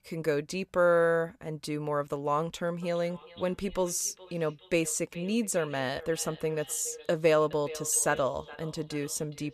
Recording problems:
echo of what is said; faint; from 3 s on; 420 ms later, 20 dB below the speech

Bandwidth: 14.5 kHz